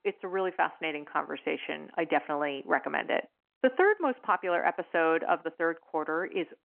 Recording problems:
muffled; very; fading above 3 kHz
phone-call audio

